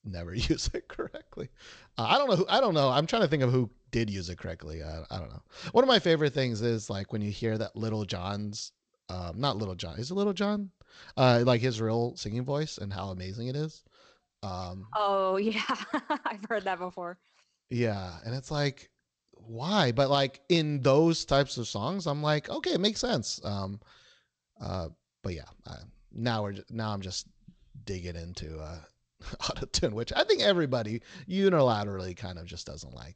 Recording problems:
garbled, watery; slightly; nothing above 7.5 kHz

